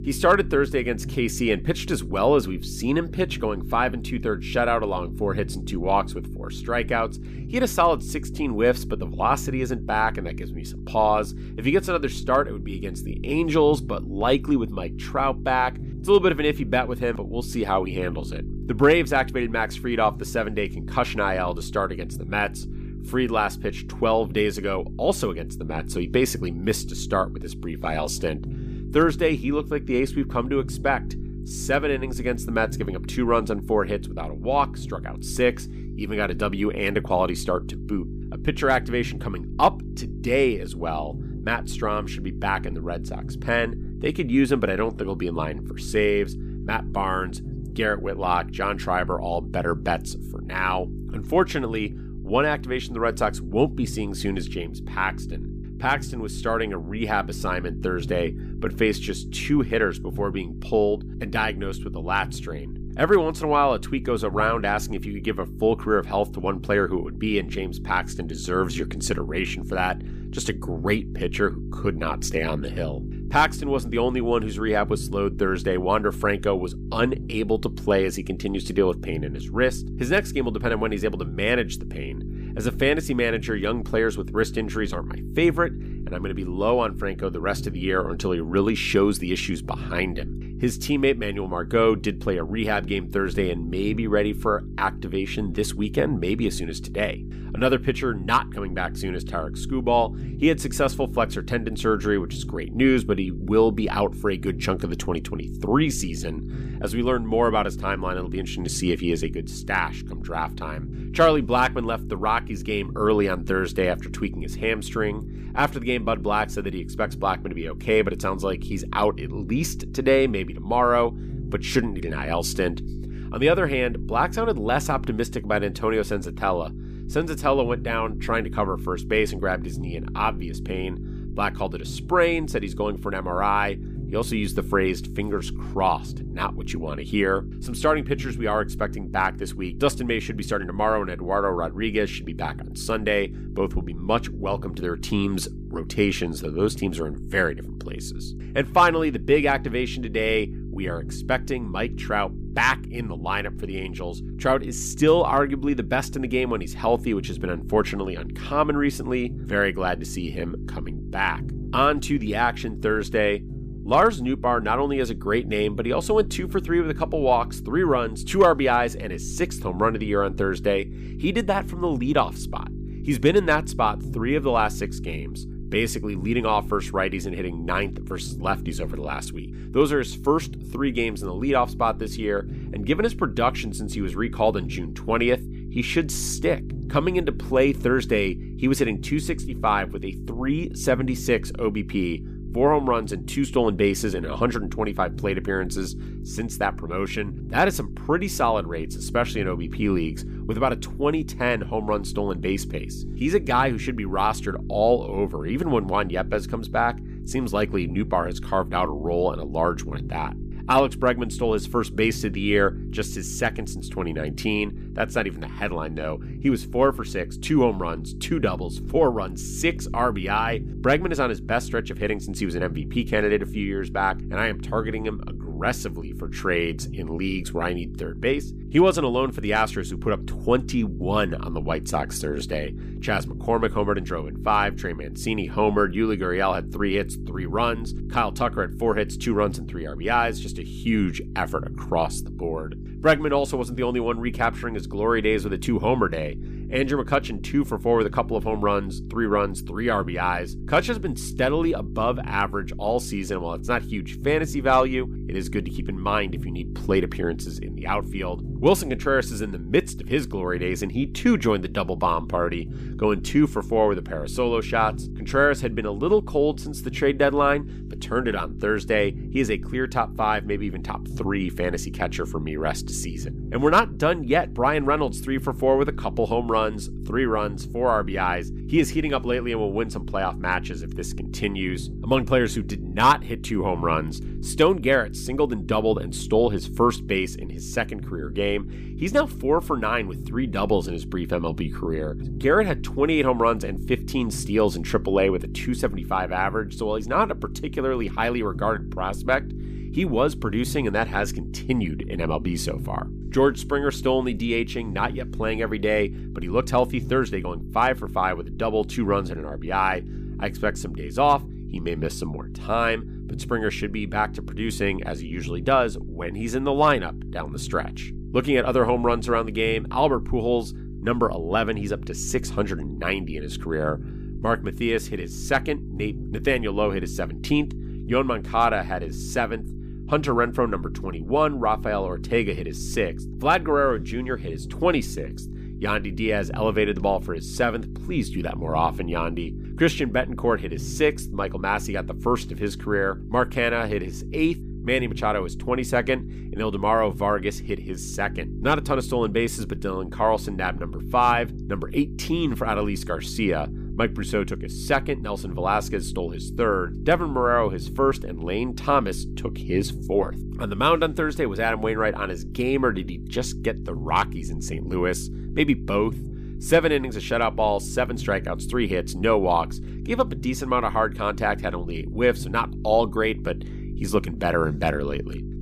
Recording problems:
electrical hum; noticeable; throughout; 50 Hz, 20 dB below the speech

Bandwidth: 15 kHz